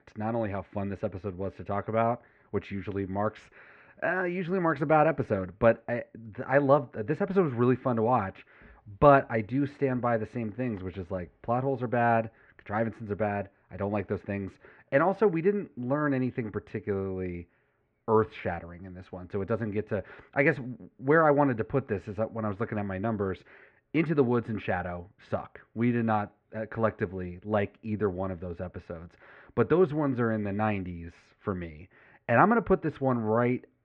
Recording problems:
muffled; very; fading above 2 kHz

